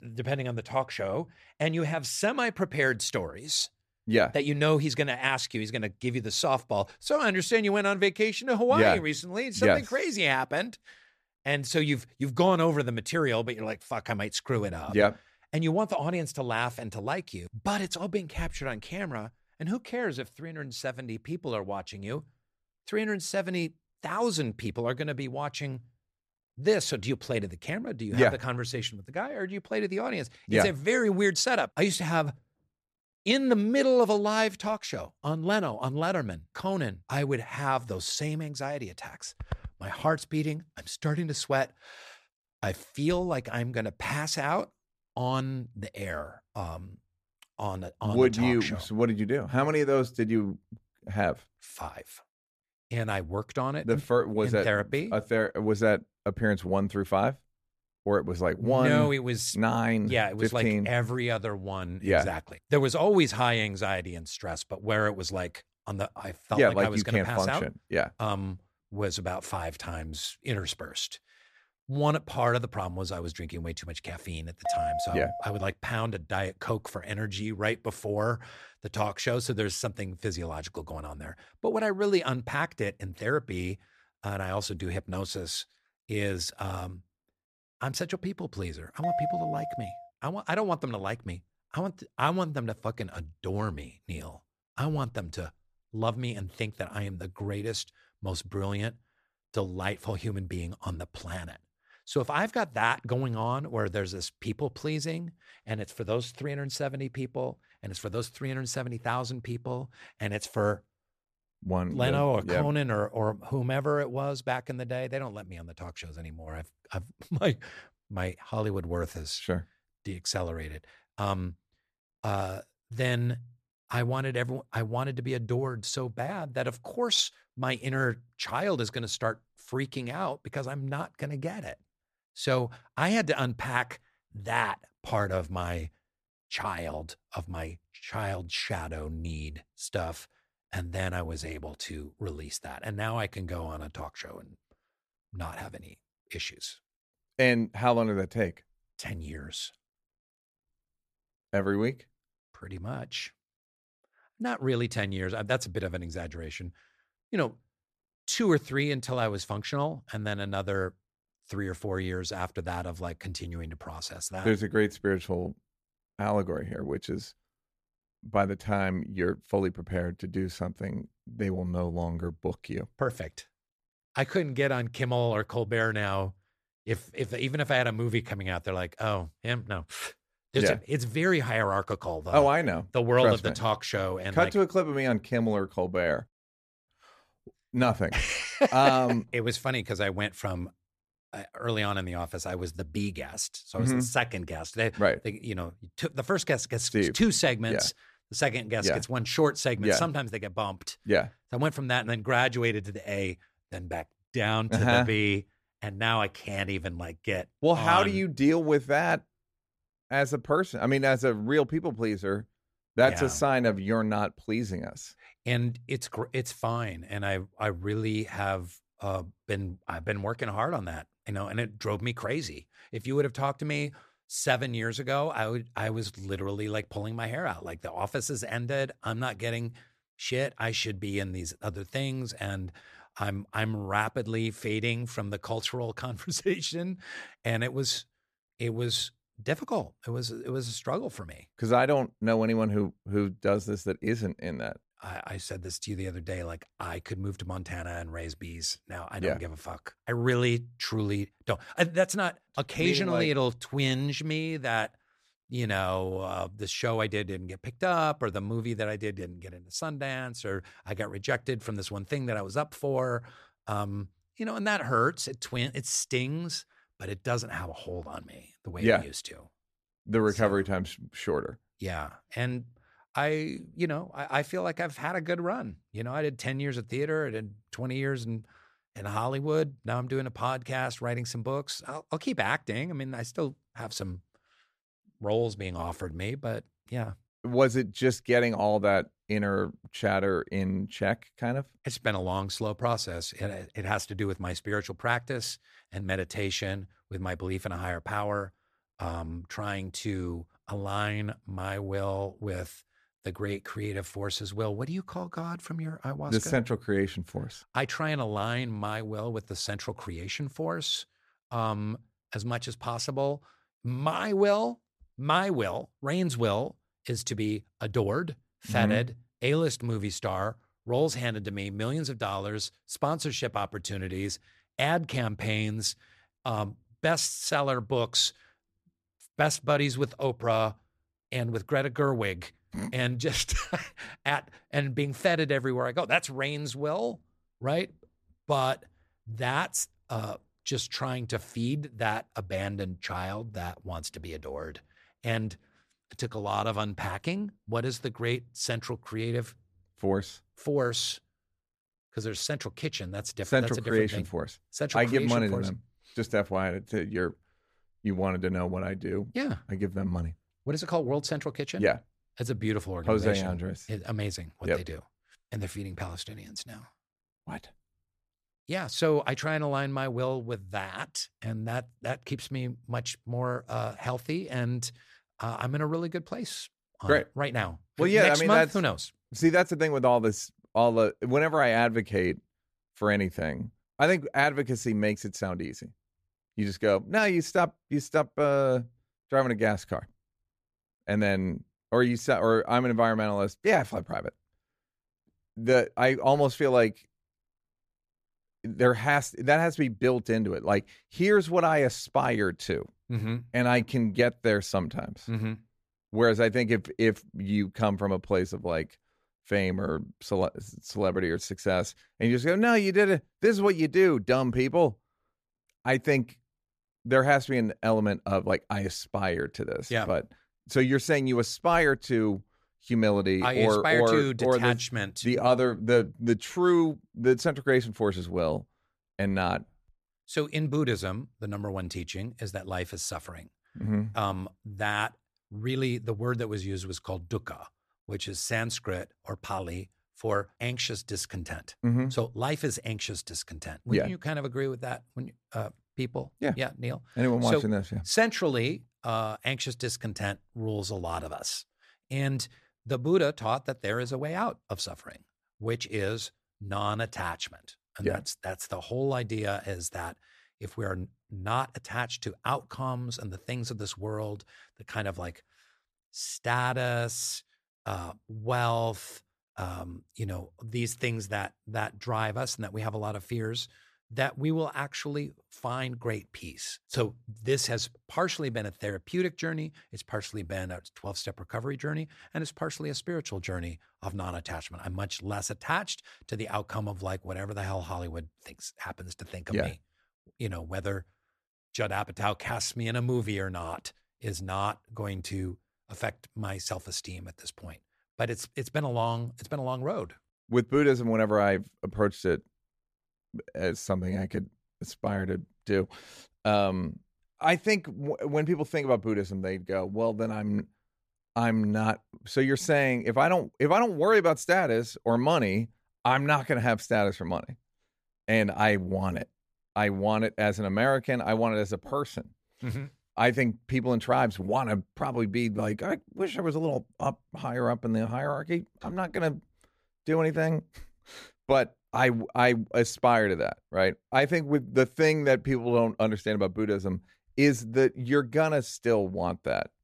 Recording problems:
none

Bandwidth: 14.5 kHz